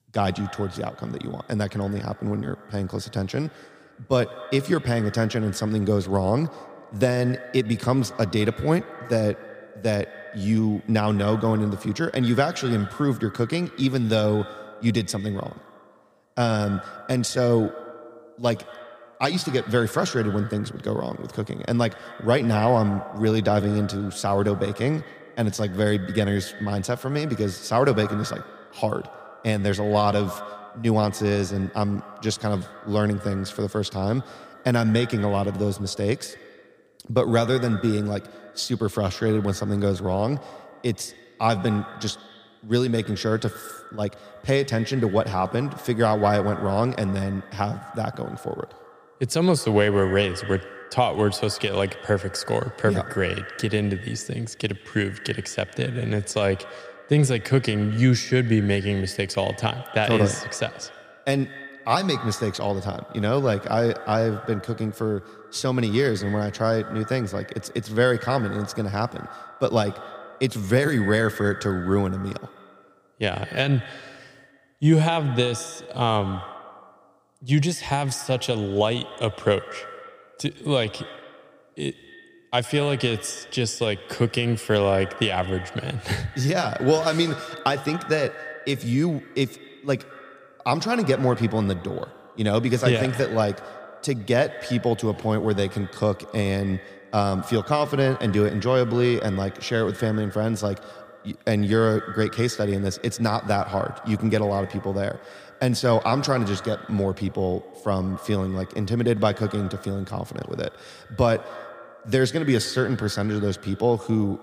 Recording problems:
echo of what is said; noticeable; throughout; 100 ms later, 15 dB below the speech

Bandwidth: 15 kHz